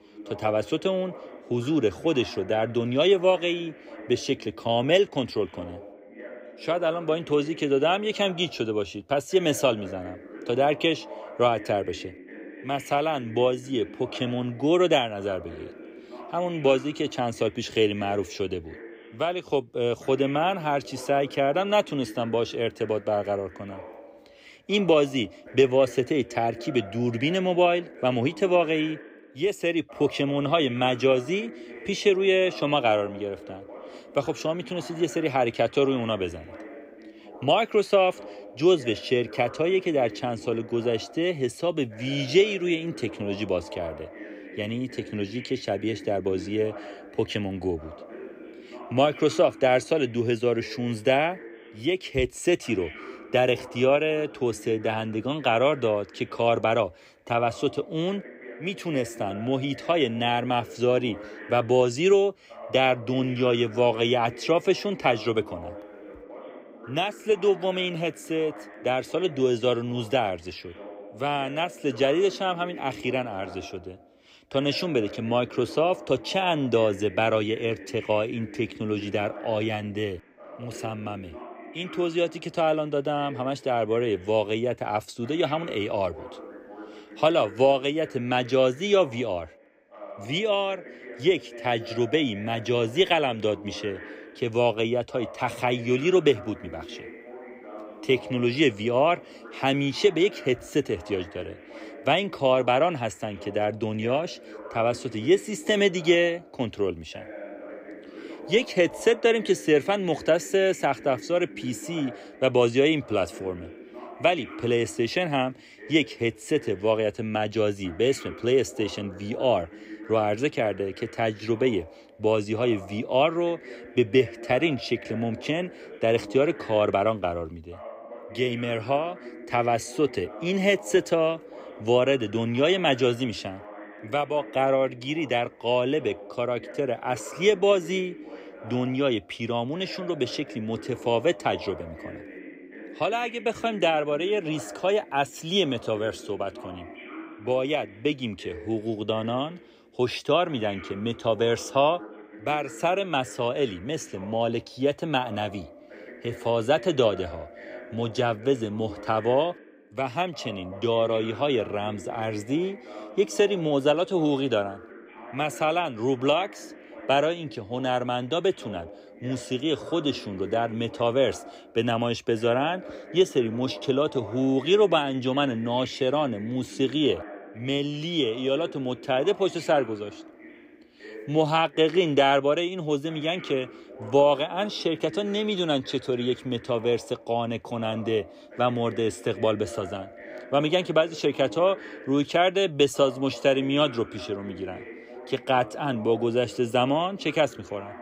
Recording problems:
voice in the background; noticeable; throughout; 15 dB below the speech

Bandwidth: 15.5 kHz